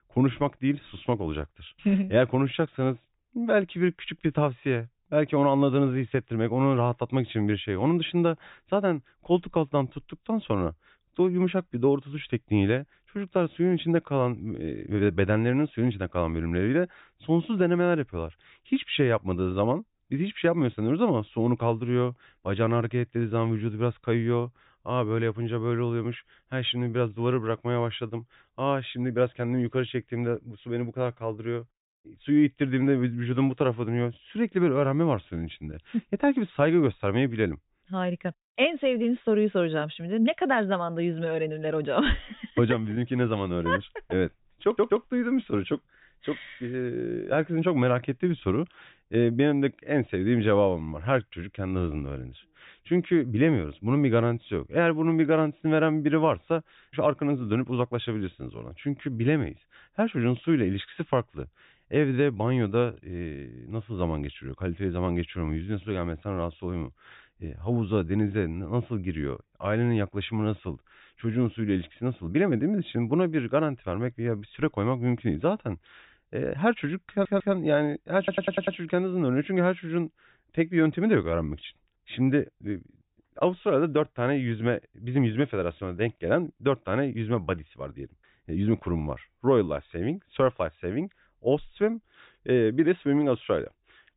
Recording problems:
high frequencies cut off; severe; nothing above 4 kHz
audio stuttering; at 45 s, at 1:17 and at 1:18

